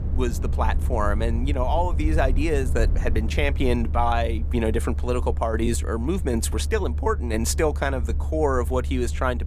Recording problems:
low rumble; noticeable; throughout; 15 dB below the speech

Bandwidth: 15 kHz